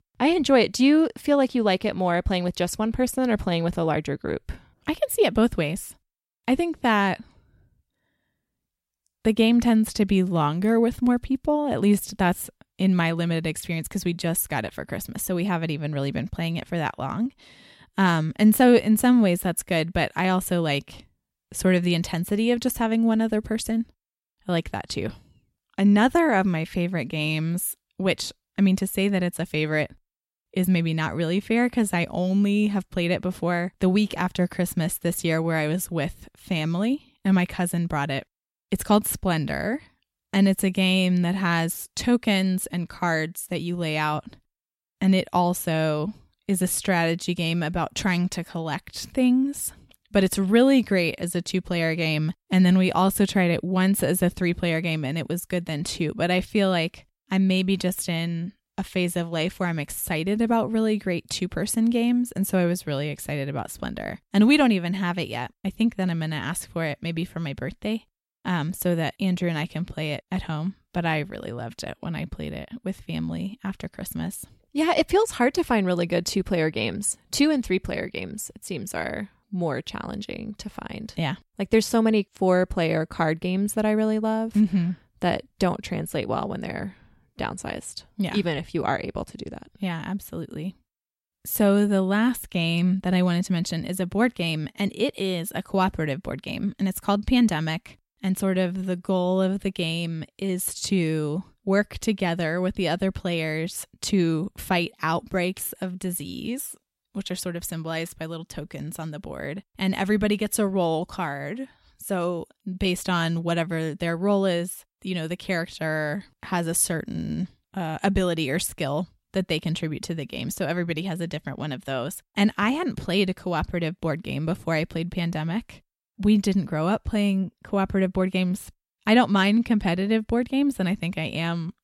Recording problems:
none

